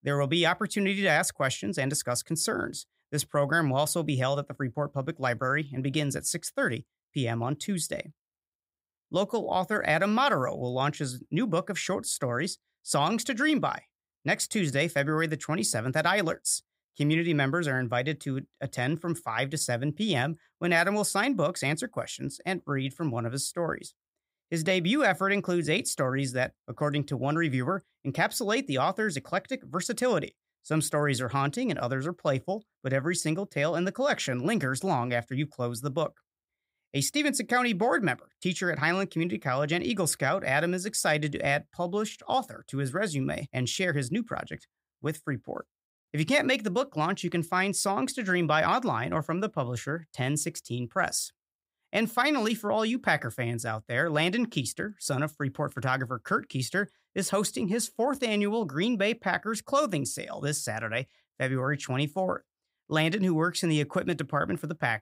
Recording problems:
none

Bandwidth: 15.5 kHz